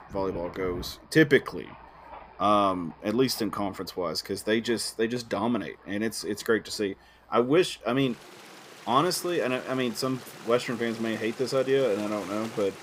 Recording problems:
rain or running water; noticeable; throughout; 20 dB below the speech

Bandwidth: 15.5 kHz